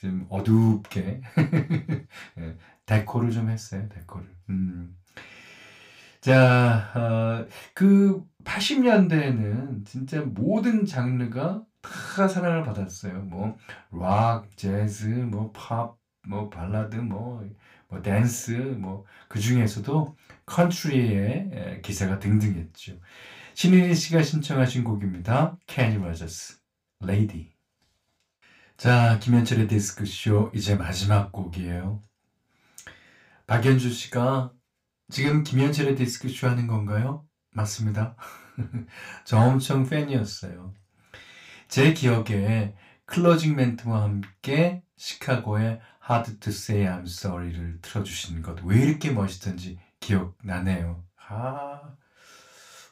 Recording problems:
room echo; very slight; dies away in 0.2 s
off-mic speech; somewhat distant

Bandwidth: 15.5 kHz